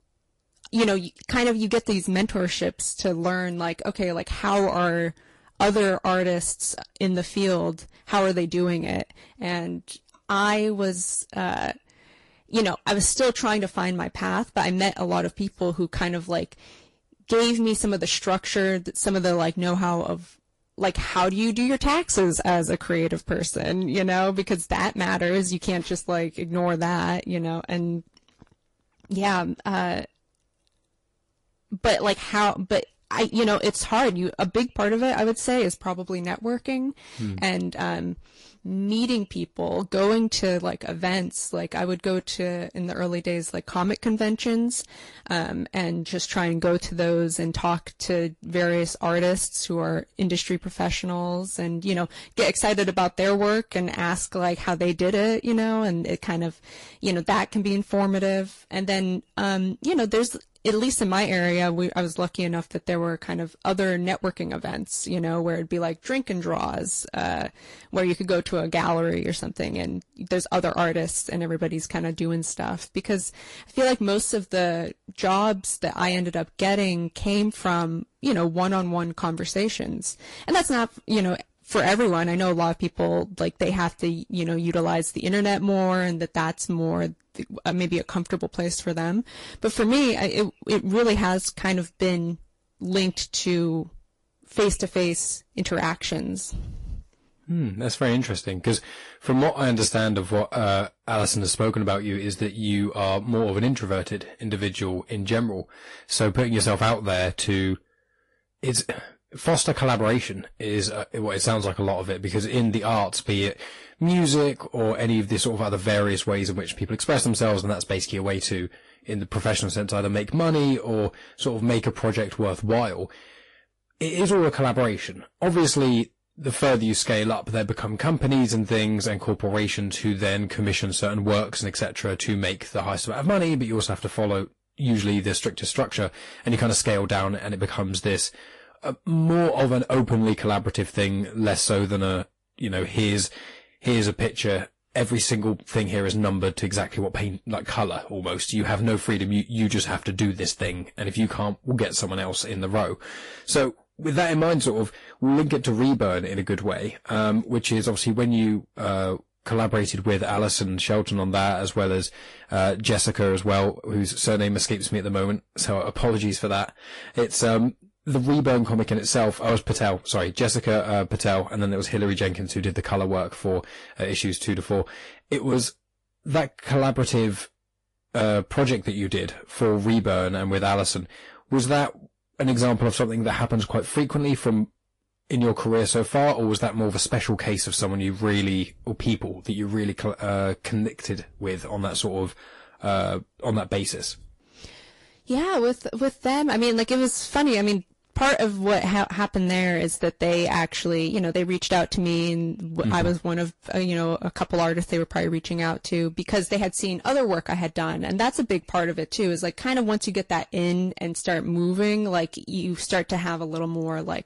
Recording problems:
distortion; slight; 10 dB below the speech
garbled, watery; slightly; nothing above 11 kHz

